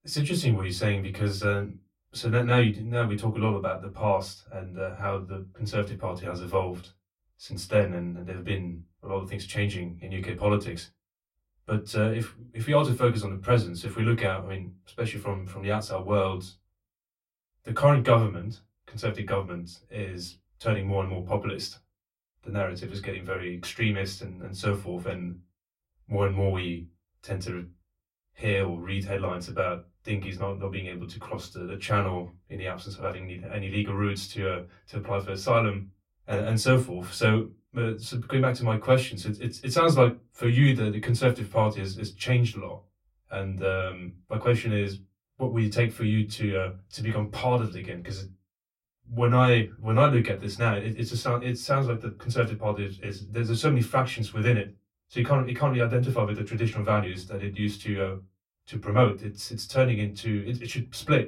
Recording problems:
off-mic speech; far
room echo; very slight; dies away in 0.2 s

